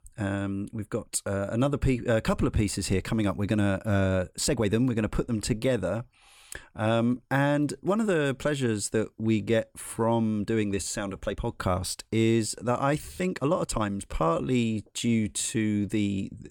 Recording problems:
uneven, jittery; strongly; from 4.5 to 16 s

